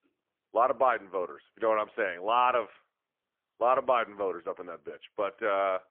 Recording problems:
phone-call audio; poor line; nothing above 3 kHz

